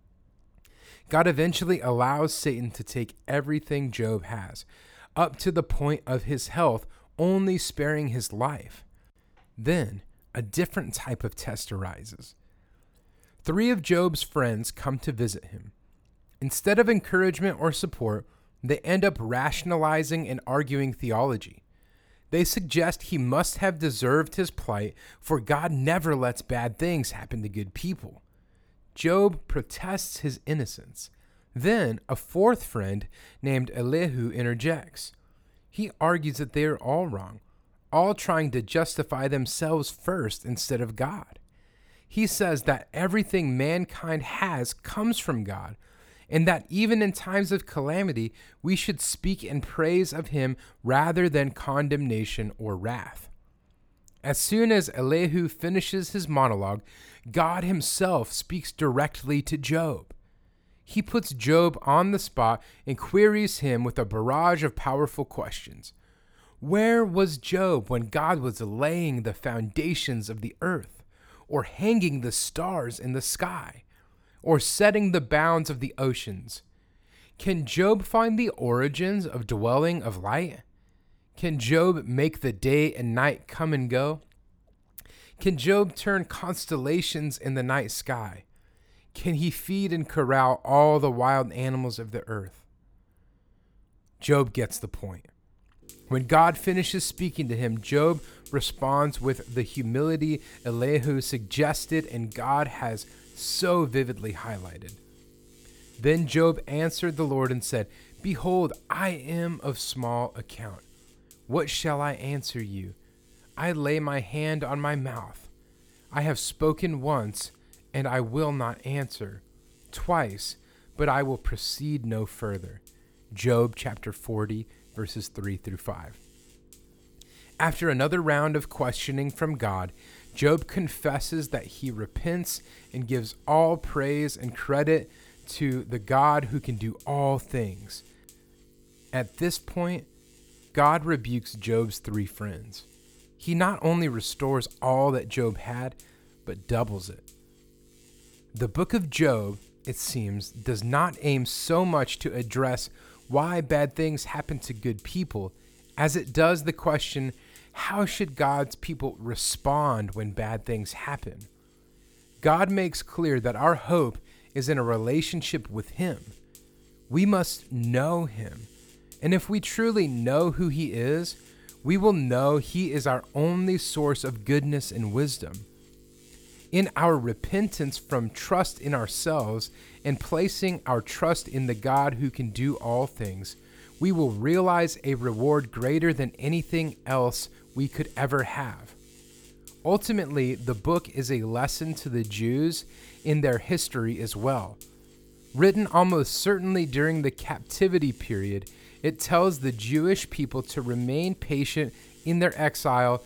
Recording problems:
electrical hum; faint; from 1:36 on; 50 Hz, 30 dB below the speech

